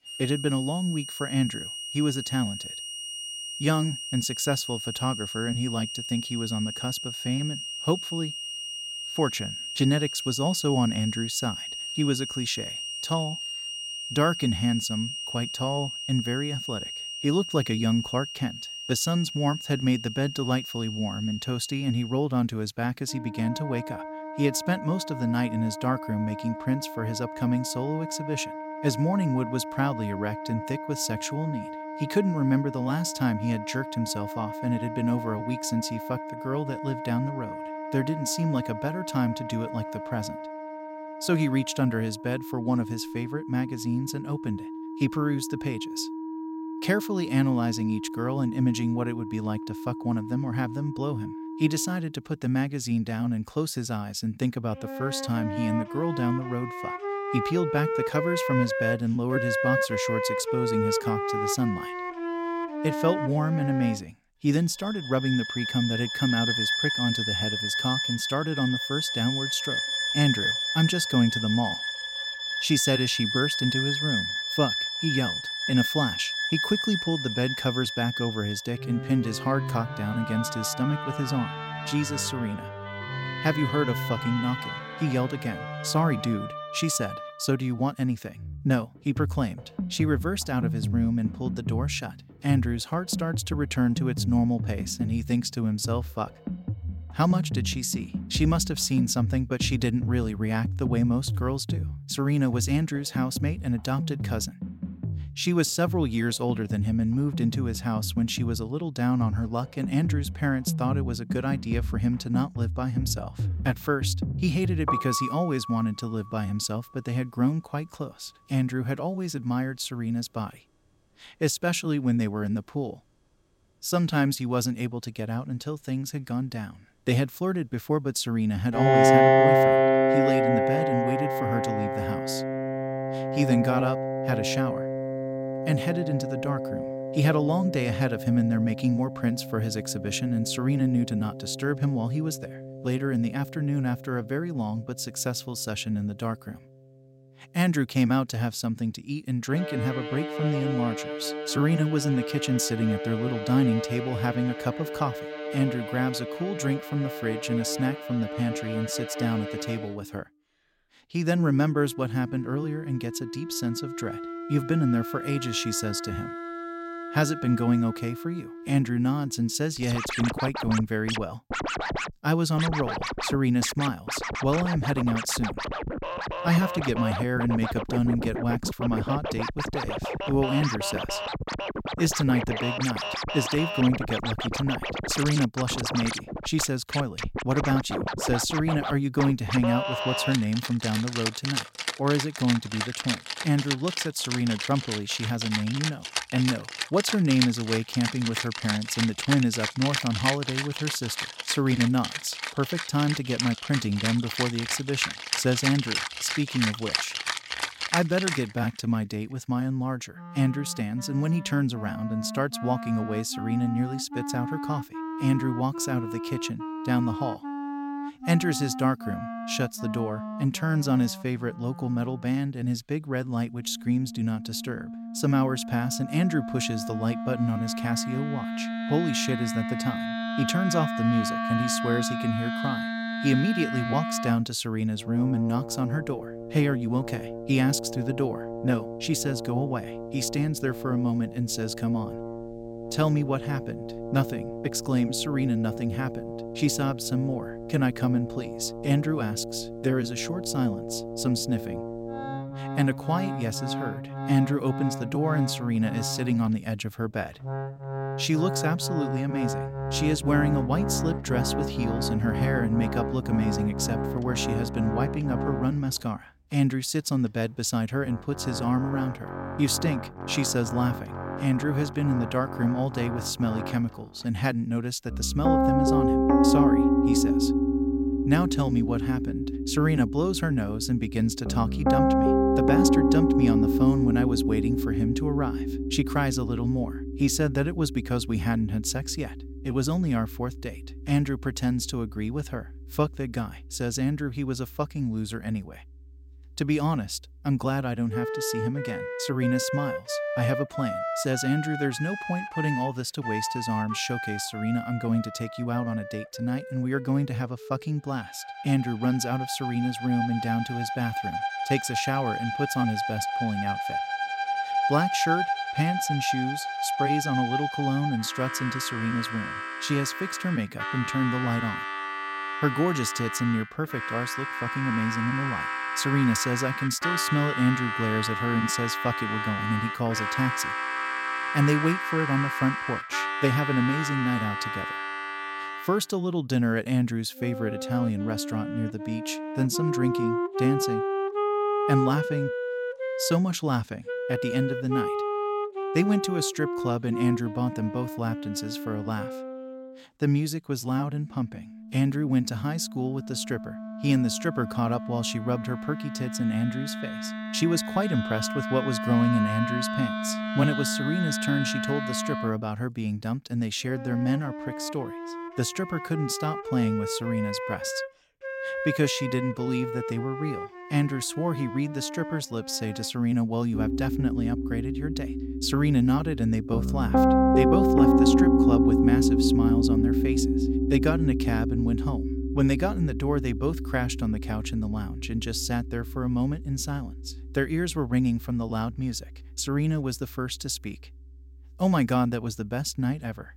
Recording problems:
background music; loud; throughout; 2 dB below the speech

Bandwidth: 16 kHz